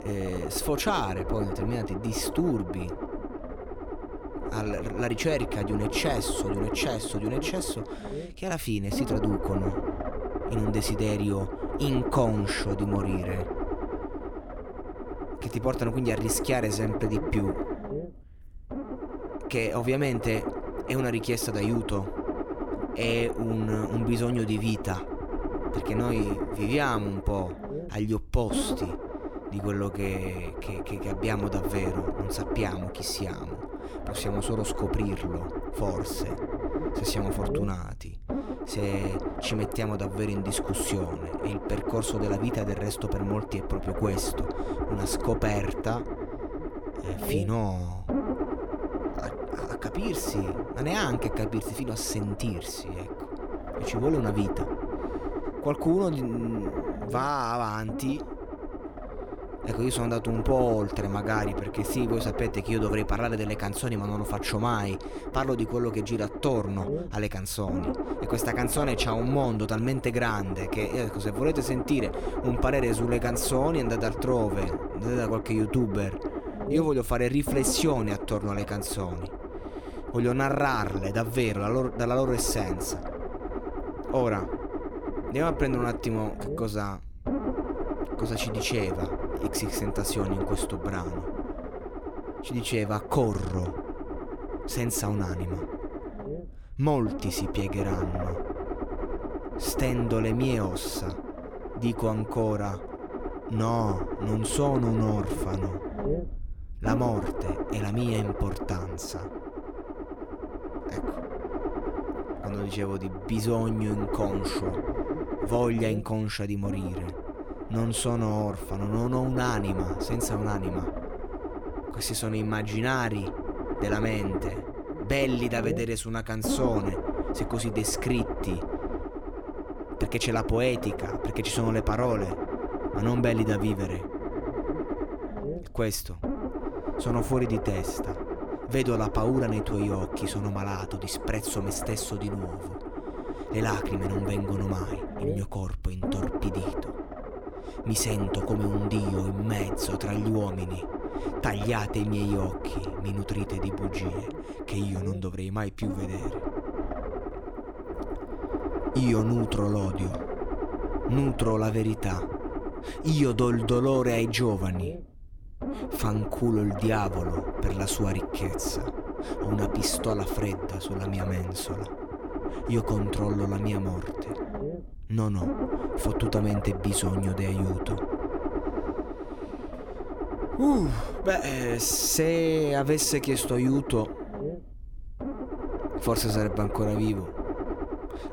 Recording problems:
low rumble; loud; throughout; 4 dB below the speech

